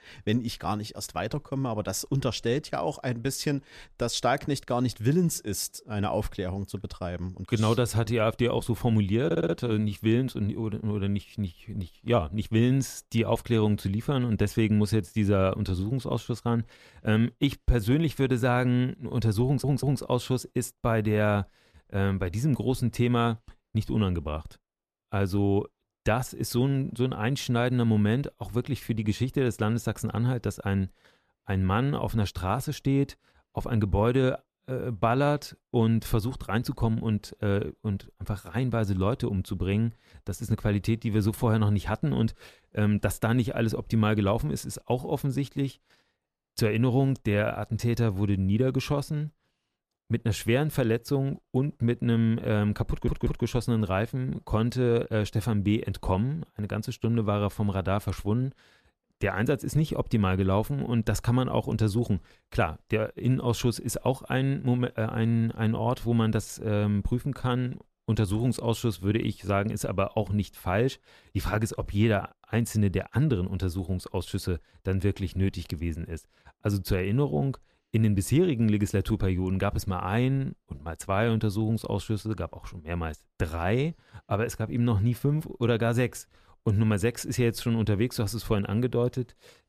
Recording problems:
audio stuttering; at 9.5 s, at 19 s and at 53 s

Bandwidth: 14.5 kHz